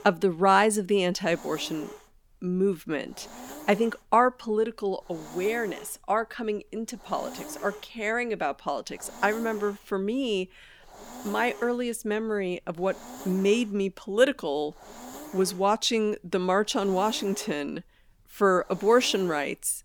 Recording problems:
hiss; noticeable; throughout; 15 dB below the speech

